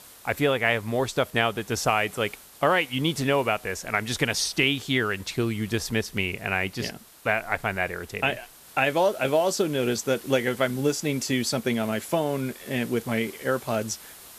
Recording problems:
hiss; noticeable; throughout; 20 dB below the speech

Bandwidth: 14.5 kHz